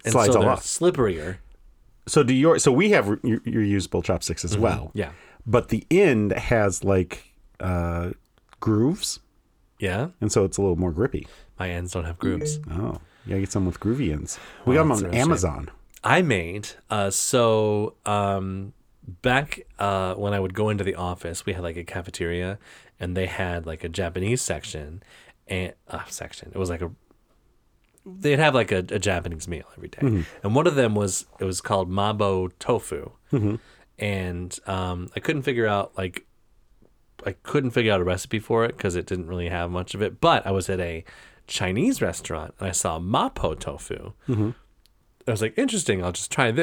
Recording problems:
phone ringing; noticeable; at 12 s; peak 3 dB below the speech
abrupt cut into speech; at the end

